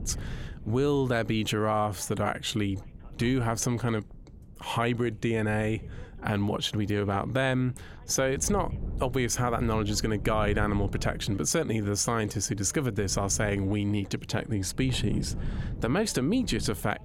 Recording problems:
wind noise on the microphone; occasional gusts; 20 dB below the speech
voice in the background; faint; throughout; 30 dB below the speech

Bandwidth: 16.5 kHz